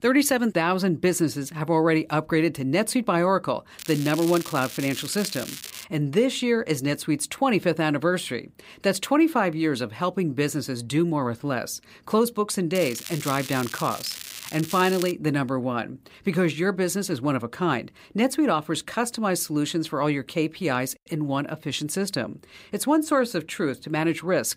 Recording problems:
crackling; noticeable; from 4 to 6 s and from 13 to 15 s; 10 dB below the speech

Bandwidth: 15.5 kHz